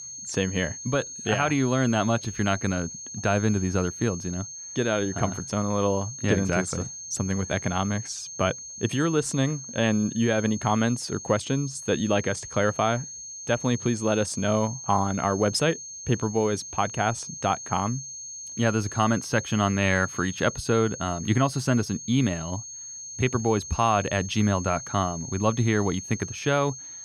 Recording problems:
high-pitched whine; noticeable; throughout; 6.5 kHz, 10 dB below the speech

